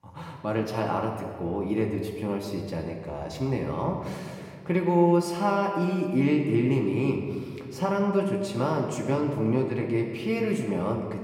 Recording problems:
room echo; noticeable; dies away in 1.5 s
off-mic speech; somewhat distant

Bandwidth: 16 kHz